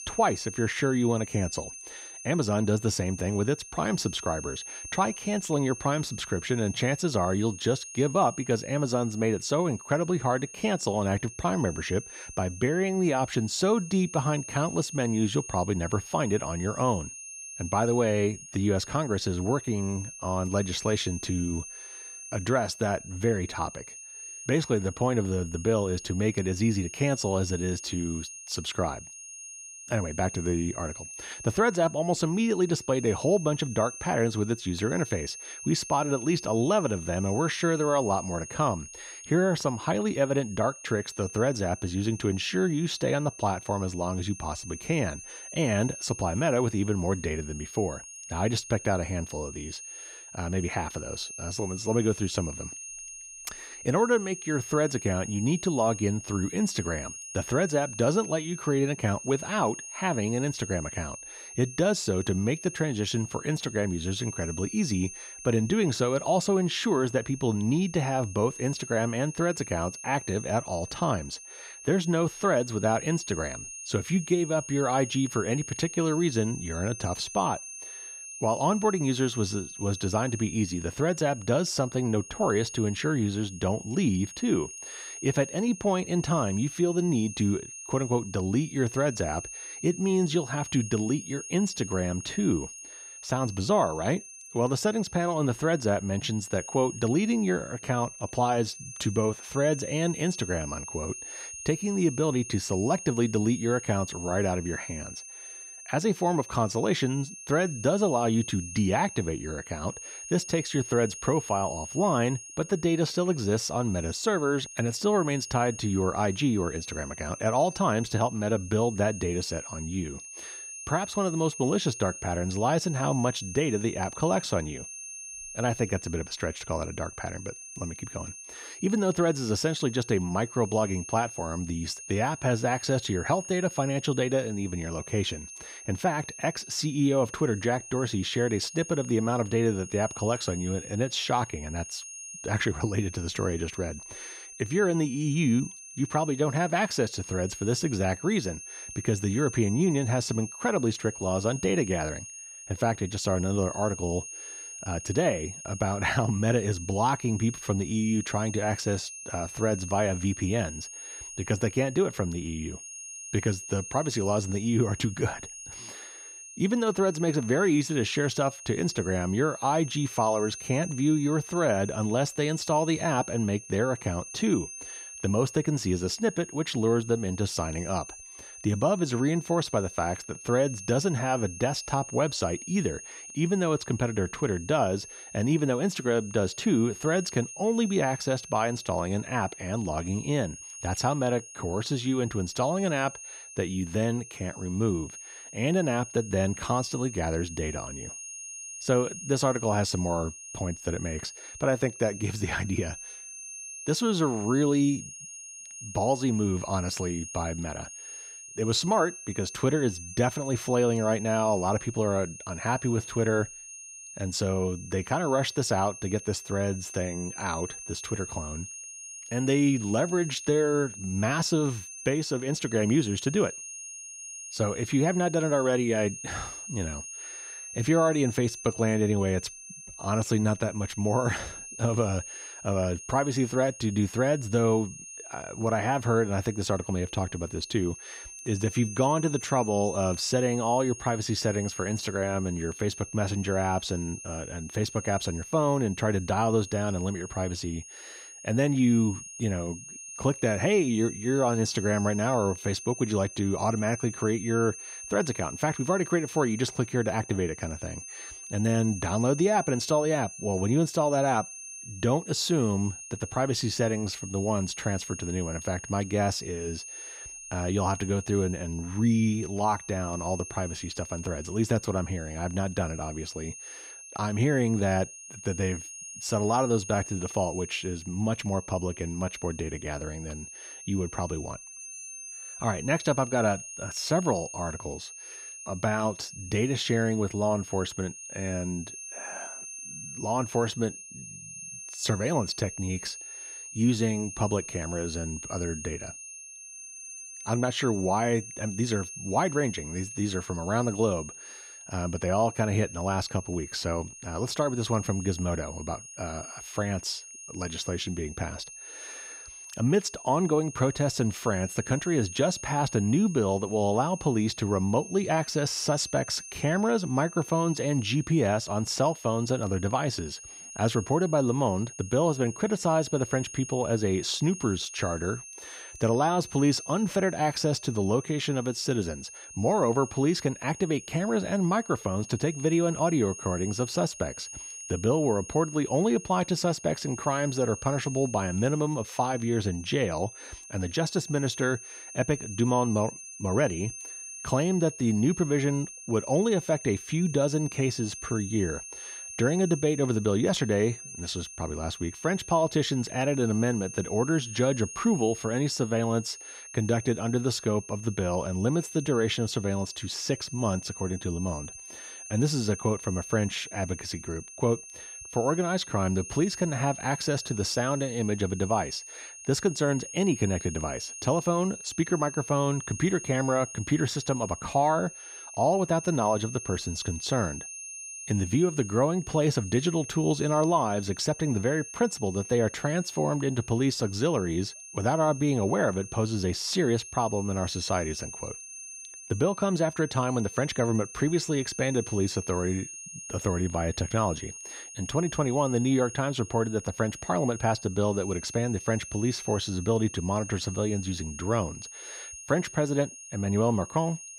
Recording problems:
high-pitched whine; noticeable; throughout; 6.5 kHz, 10 dB below the speech

